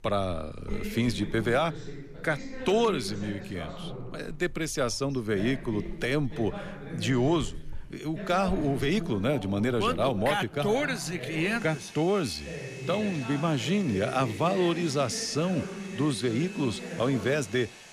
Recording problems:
household noises; noticeable; throughout; 20 dB below the speech
voice in the background; noticeable; throughout; 10 dB below the speech

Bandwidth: 14.5 kHz